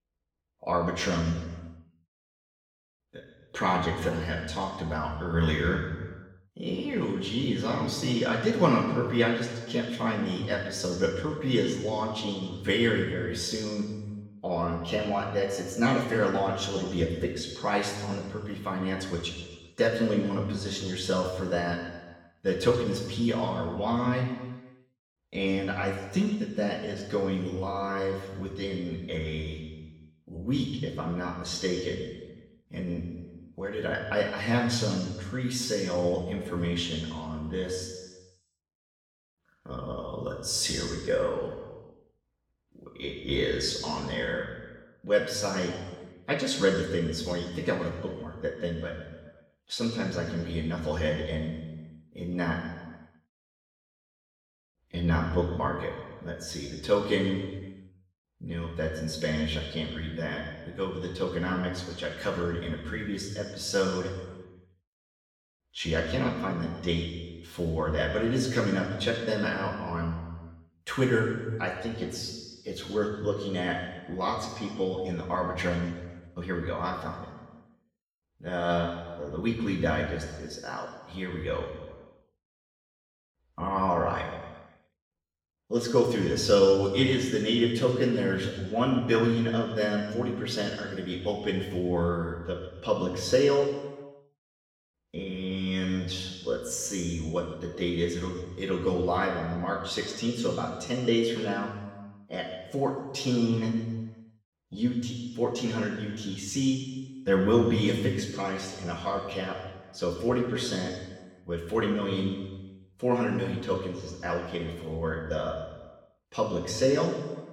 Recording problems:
off-mic speech; far
room echo; noticeable; dies away in 1.2 s

